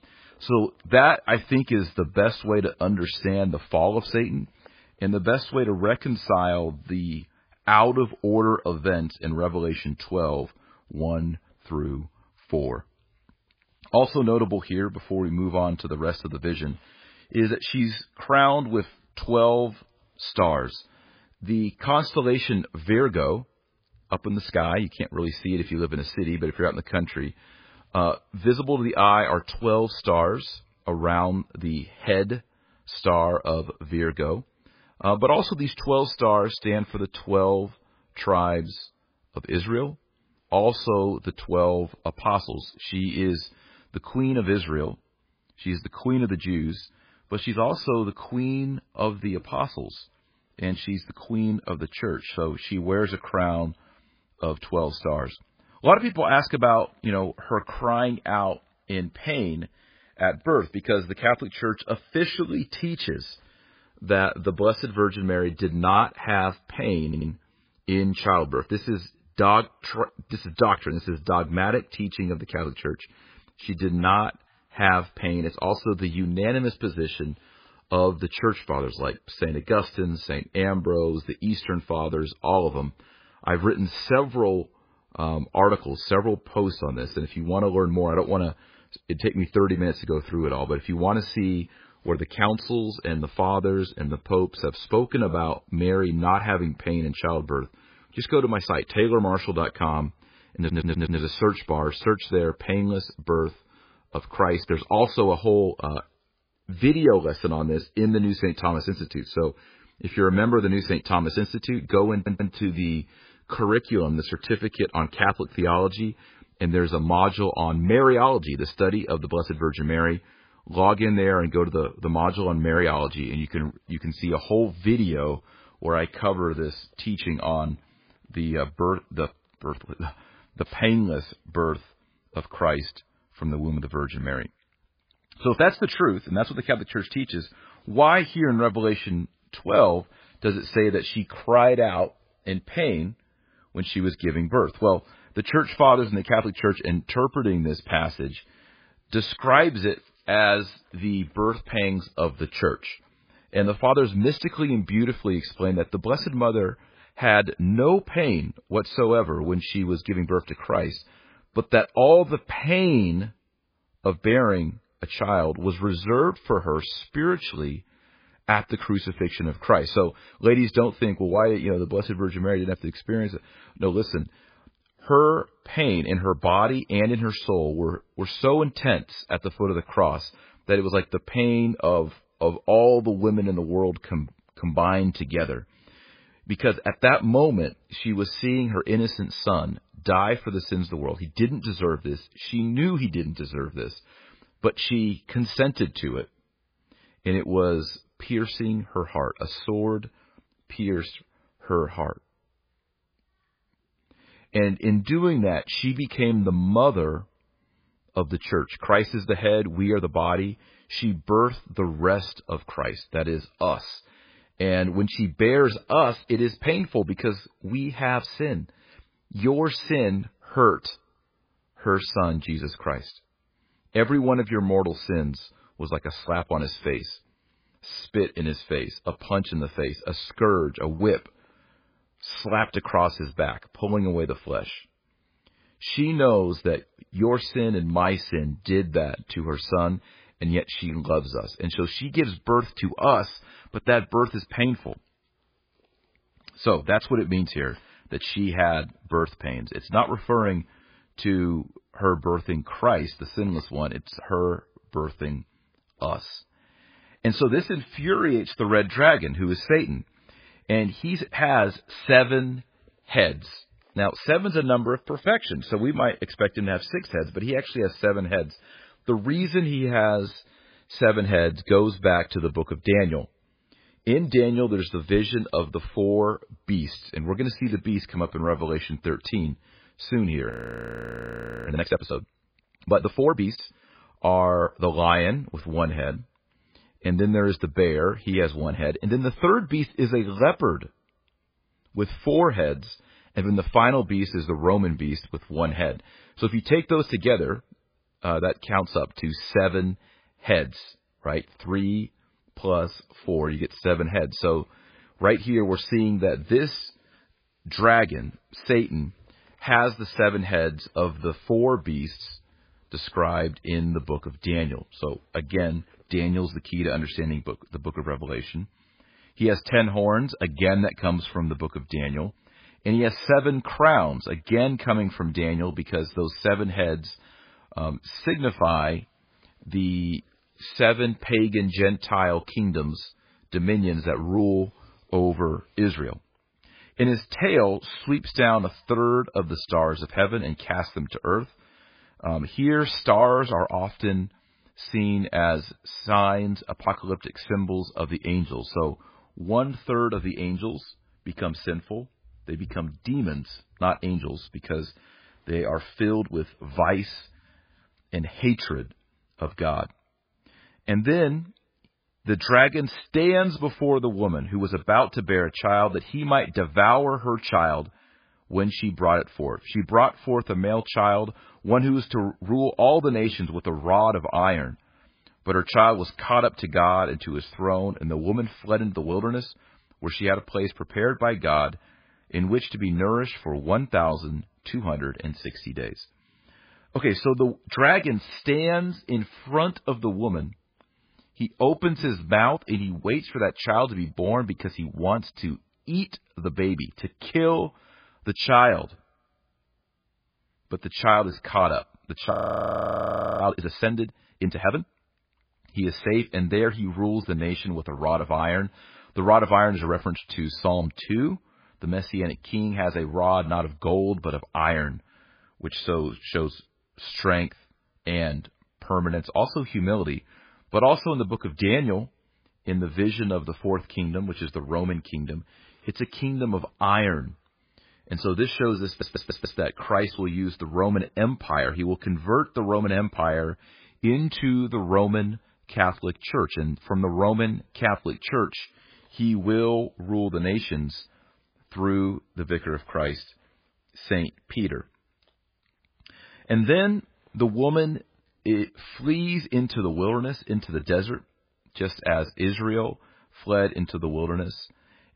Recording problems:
garbled, watery; badly; nothing above 5 kHz
audio stuttering; 4 times, first at 1:07
audio freezing; at 4:41 for 1 s and at 6:42 for 1 s

